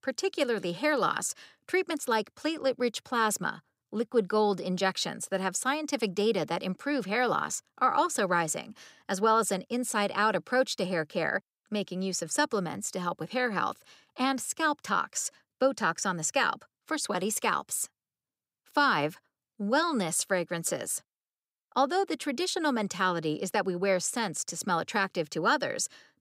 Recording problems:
none

